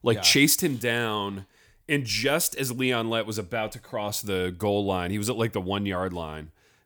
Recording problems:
none

